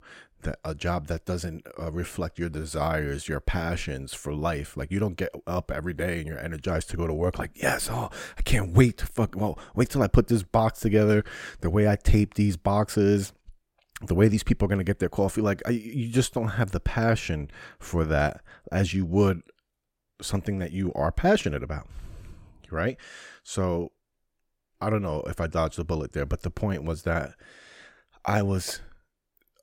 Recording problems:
none

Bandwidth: 16.5 kHz